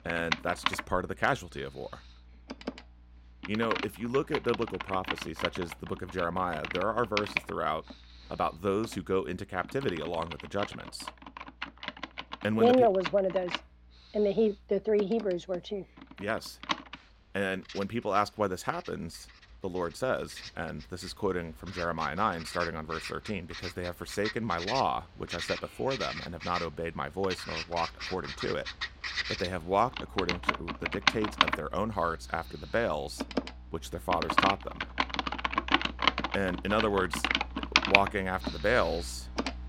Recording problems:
household noises; loud; throughout; 2 dB below the speech

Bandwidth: 16 kHz